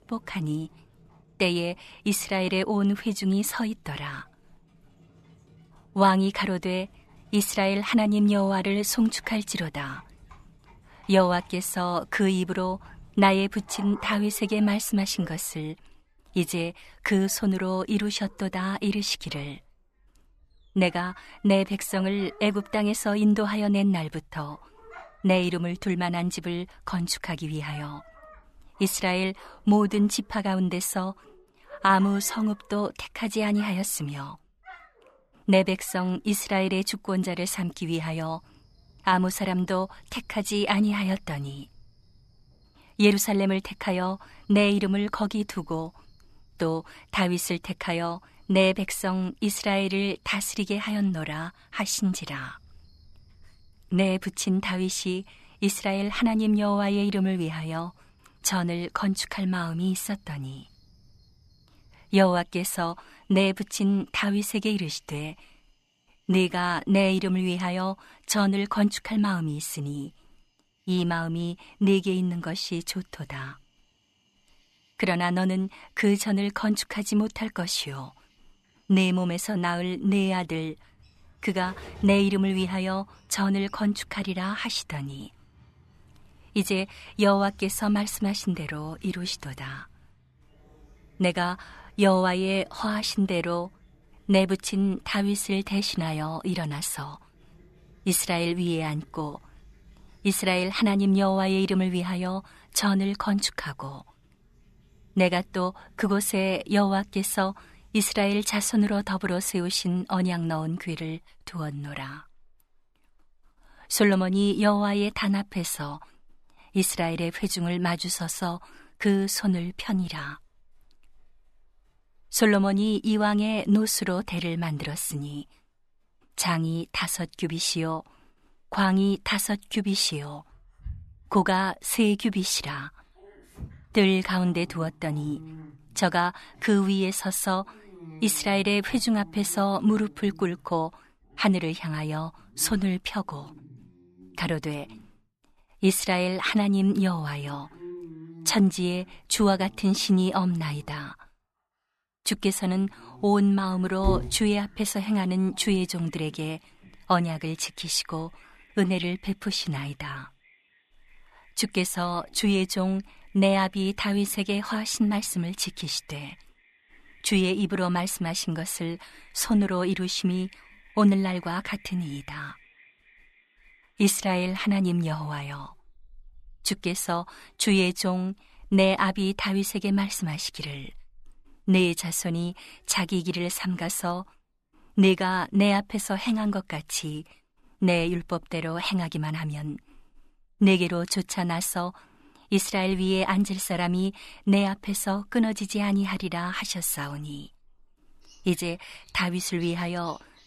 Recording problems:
animal sounds; faint; throughout; 25 dB below the speech

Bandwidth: 13.5 kHz